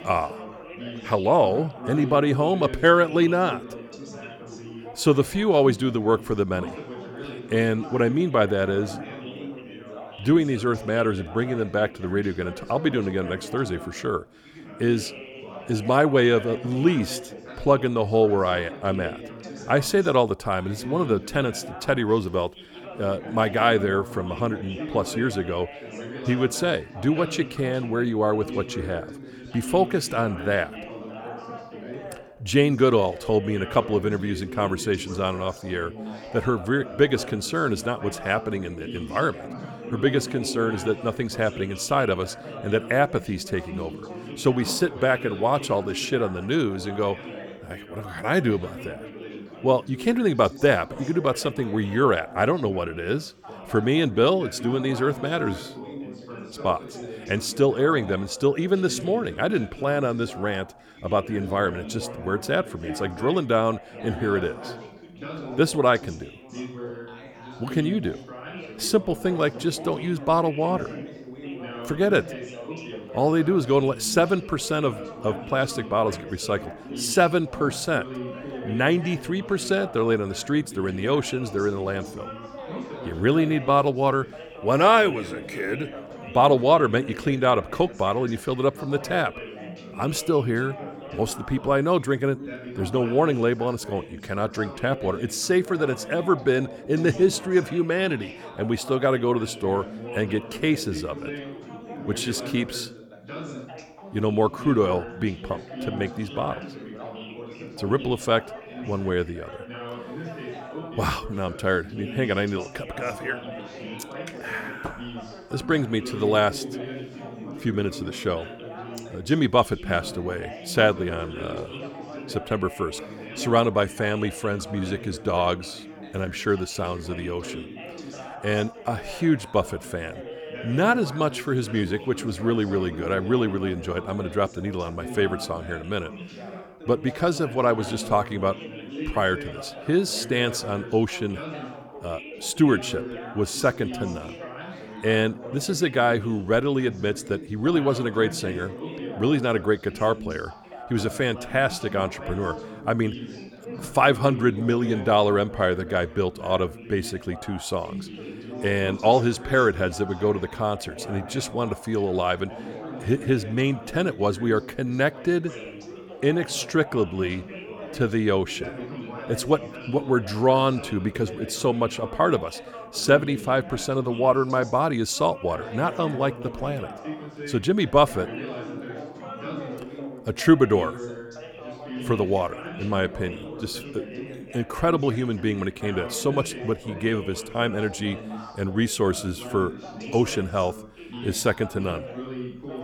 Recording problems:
background chatter; noticeable; throughout; 3 voices, 15 dB below the speech

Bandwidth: 19 kHz